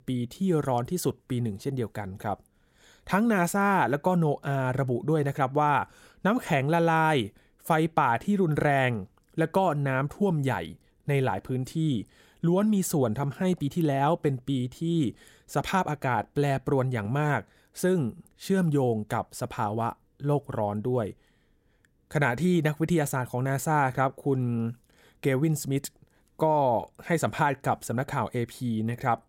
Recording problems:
none

